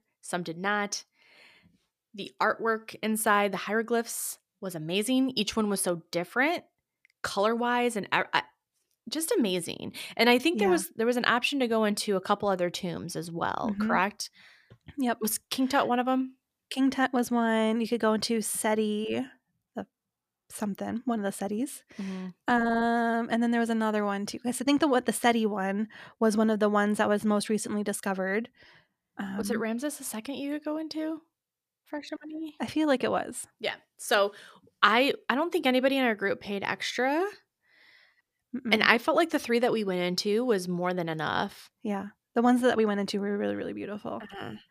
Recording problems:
none

